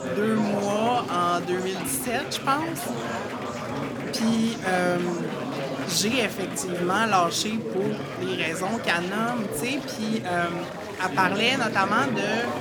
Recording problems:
chatter from many people; loud; throughout; 6 dB below the speech

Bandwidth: 19 kHz